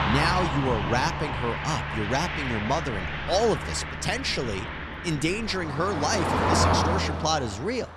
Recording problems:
traffic noise; loud; throughout; 1 dB below the speech

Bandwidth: 13.5 kHz